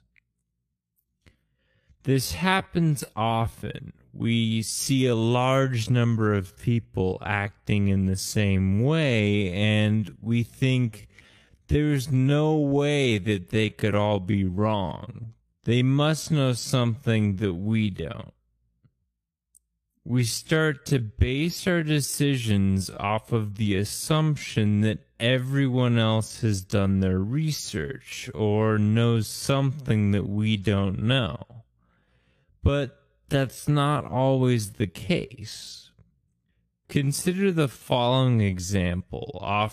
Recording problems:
wrong speed, natural pitch; too slow; 0.6 times normal speed

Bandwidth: 14.5 kHz